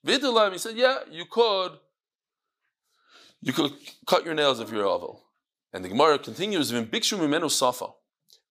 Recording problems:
thin; very slightly; fading below 700 Hz

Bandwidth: 15 kHz